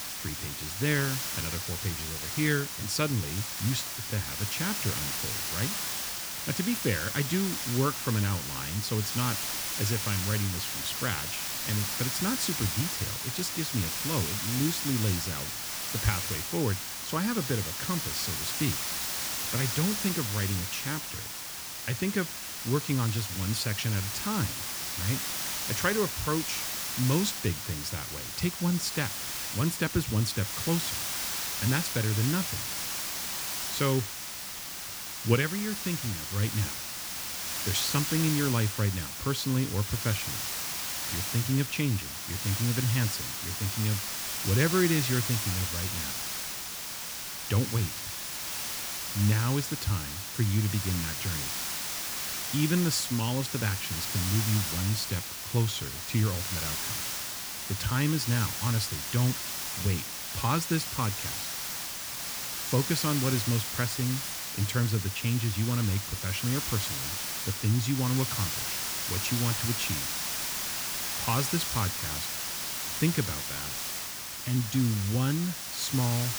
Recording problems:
hiss; loud; throughout; 1 dB below the speech

